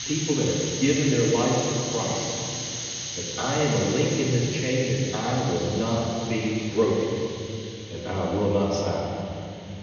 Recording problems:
off-mic speech; far
room echo; noticeable; dies away in 2.7 s
high frequencies cut off; noticeable; nothing above 6.5 kHz
hiss; loud; throughout; 6 dB below the speech

